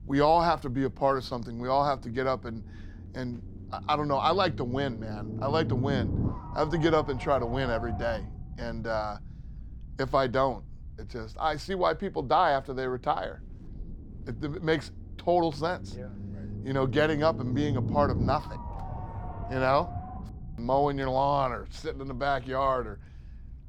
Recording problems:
low rumble; noticeable; throughout; 15 dB below the speech

